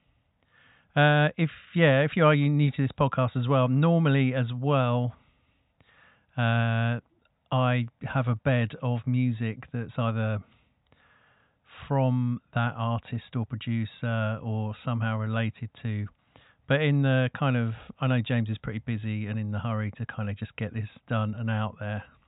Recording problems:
high frequencies cut off; severe; nothing above 4 kHz

